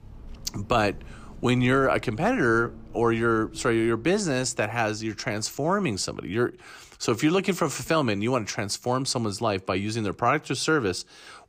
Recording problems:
traffic noise; faint; throughout; 20 dB below the speech

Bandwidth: 15 kHz